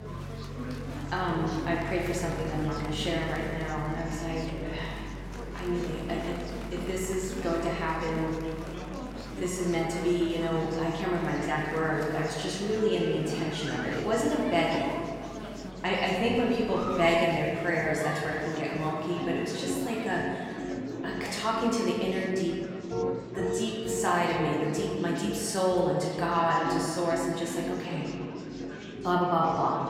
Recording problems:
off-mic speech; far
room echo; noticeable; dies away in 1.8 s
background music; noticeable; throughout; 10 dB below the speech
murmuring crowd; noticeable; throughout; 10 dB below the speech

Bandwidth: 16 kHz